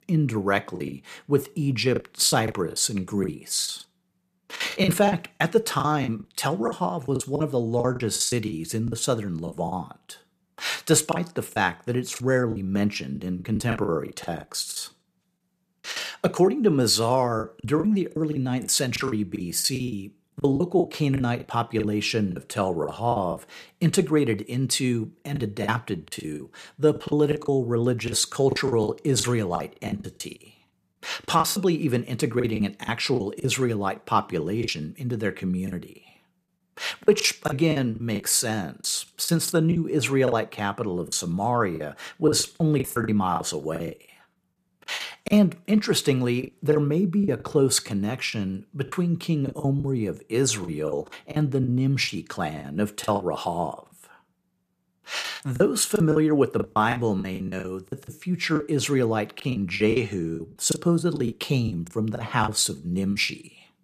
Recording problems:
choppy; very; 12% of the speech affected

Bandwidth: 14.5 kHz